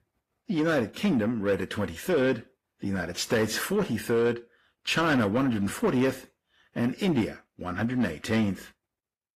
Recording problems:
distortion; slight; 10 dB below the speech
garbled, watery; slightly; nothing above 14.5 kHz

